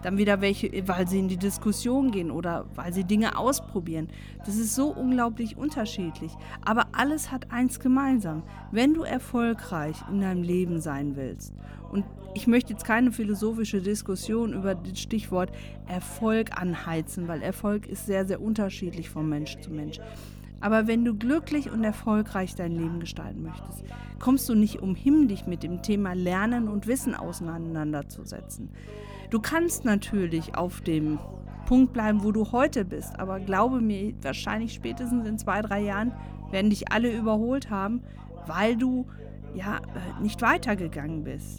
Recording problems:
electrical hum; faint; throughout; 50 Hz, 25 dB below the speech
background chatter; faint; throughout; 2 voices, 25 dB below the speech

